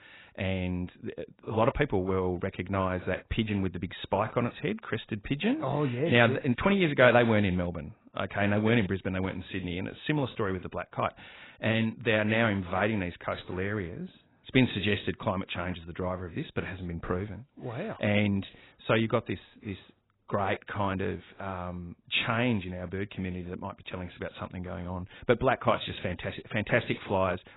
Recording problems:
garbled, watery; badly; nothing above 4 kHz

